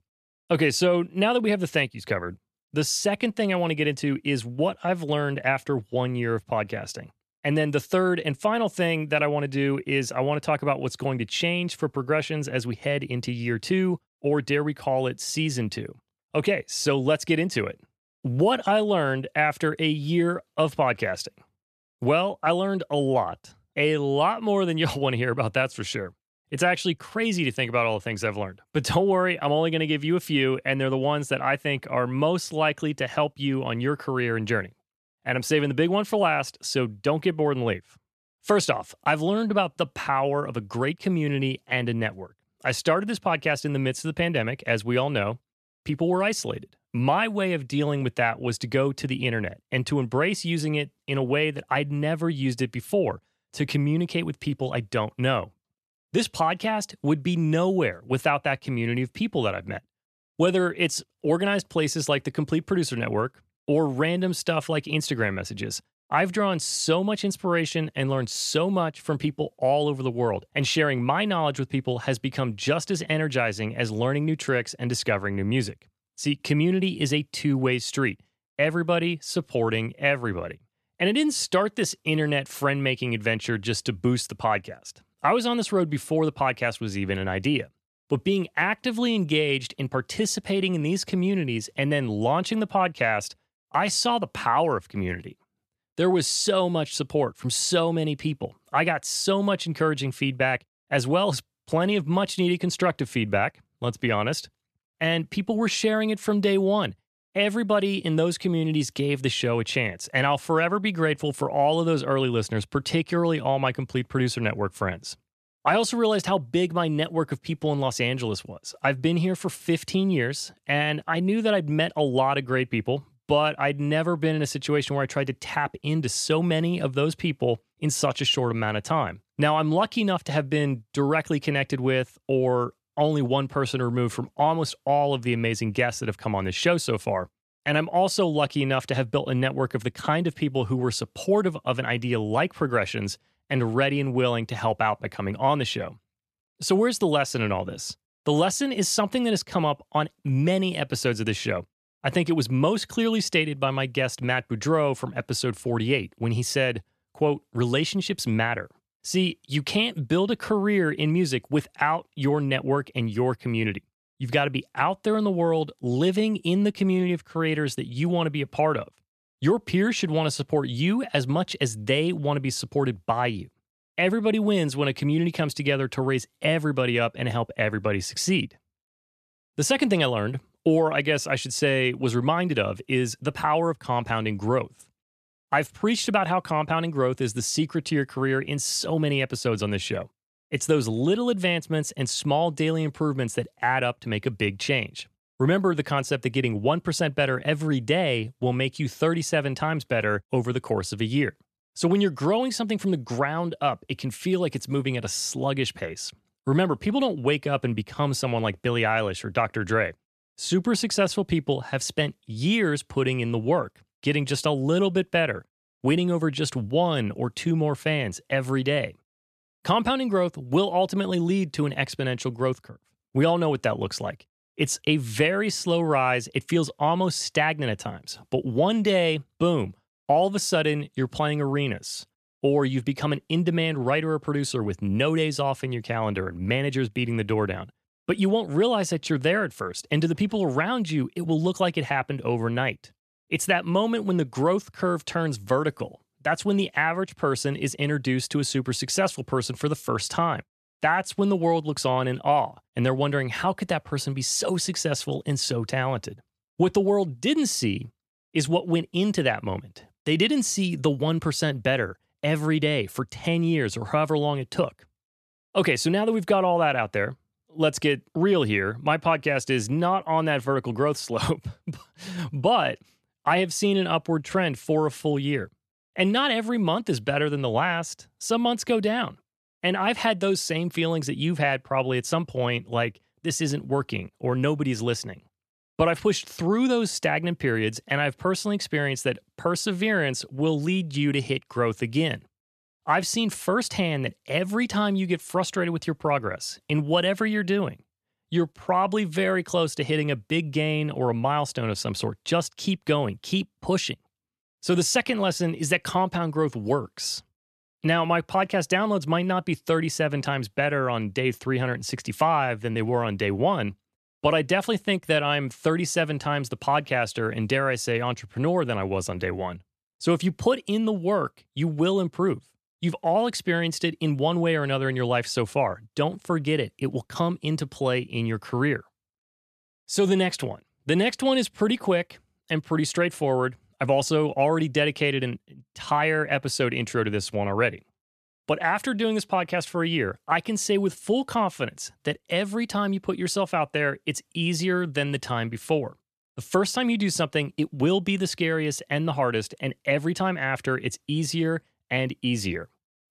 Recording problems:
none

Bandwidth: 13.5 kHz